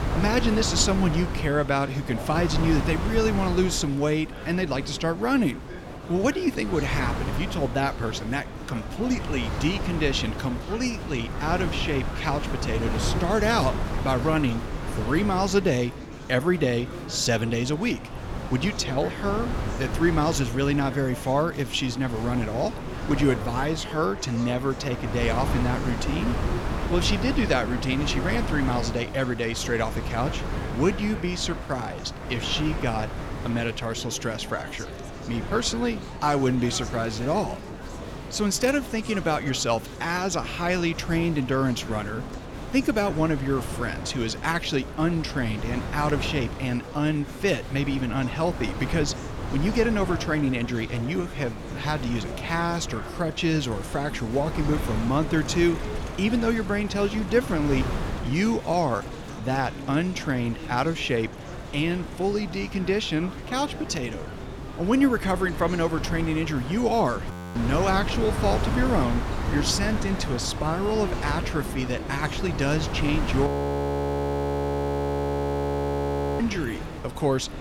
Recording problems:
wind noise on the microphone; heavy; 10 dB below the speech
murmuring crowd; noticeable; throughout; 15 dB below the speech
audio freezing; at 1:07 and at 1:13 for 3 s

